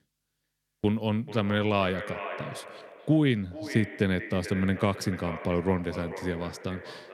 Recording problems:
echo of what is said; strong; throughout; 440 ms later, 10 dB below the speech

